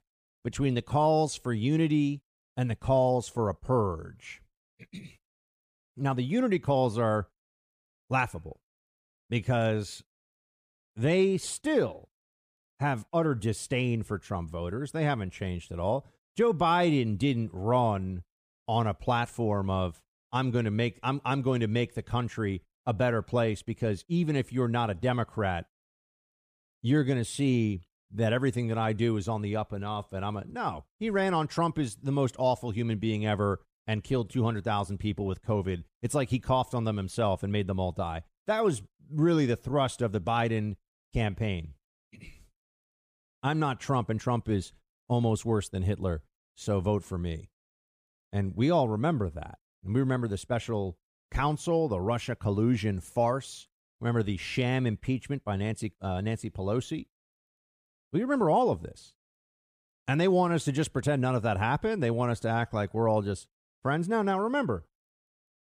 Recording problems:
none

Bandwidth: 15 kHz